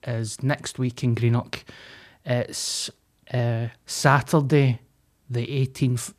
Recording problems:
none

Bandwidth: 14.5 kHz